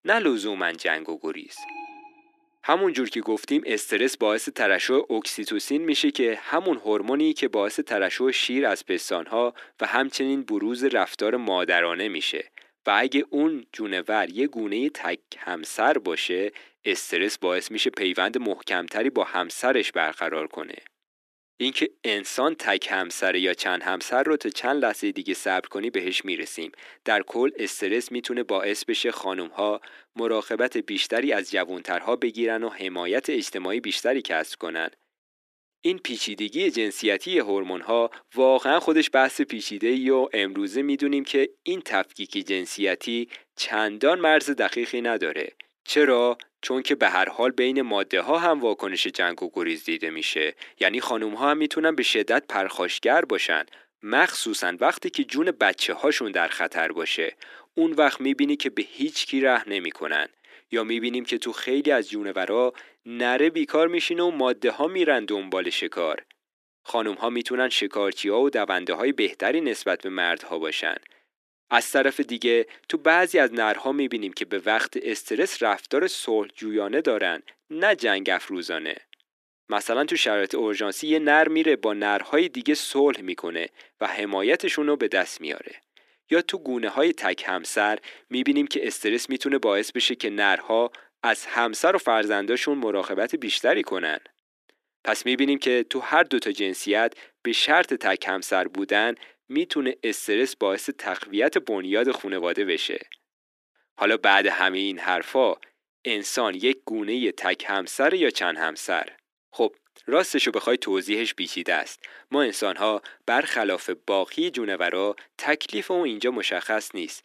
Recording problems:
thin; somewhat; fading below 300 Hz
alarm; faint; at 1.5 s; peak 15 dB below the speech

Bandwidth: 14 kHz